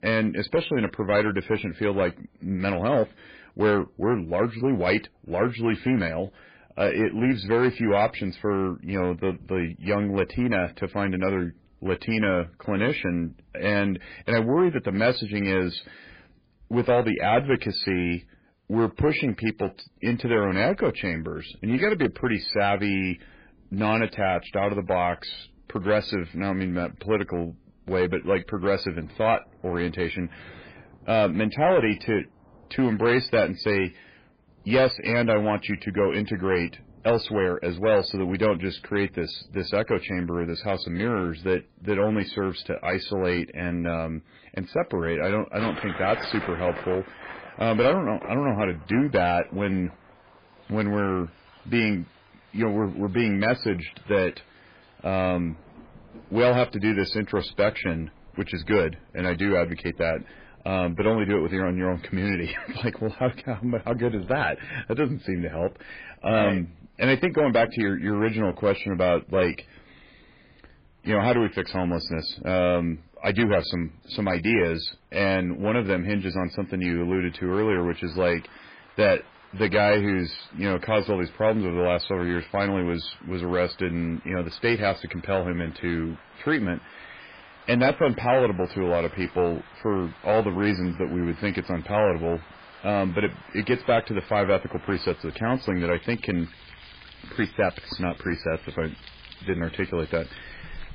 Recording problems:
garbled, watery; badly; nothing above 4.5 kHz
distortion; slight; 4% of the sound clipped
rain or running water; faint; throughout; 20 dB below the speech

